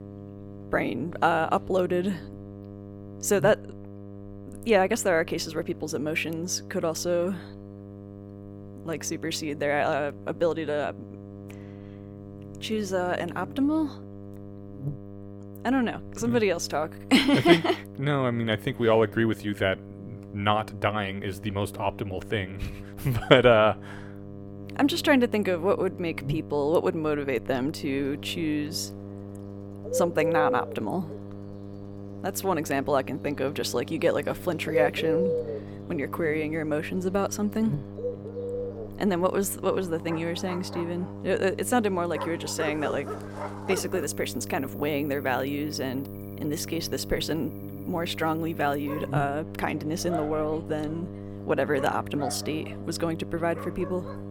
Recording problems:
animal sounds; loud; from 28 s on; 7 dB below the speech
electrical hum; noticeable; throughout; 50 Hz, 20 dB below the speech

